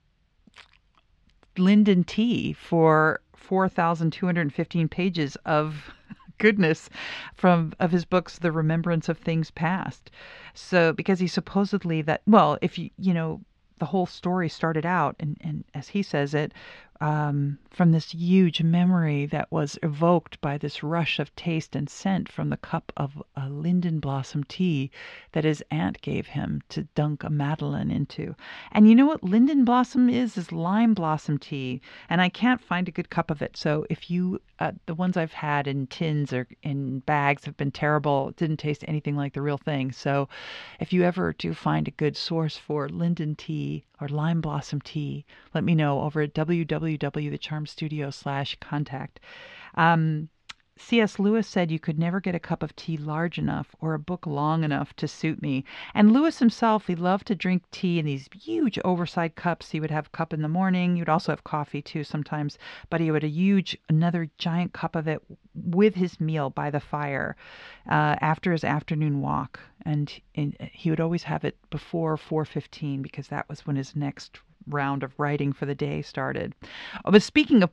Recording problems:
muffled; slightly; fading above 4 kHz

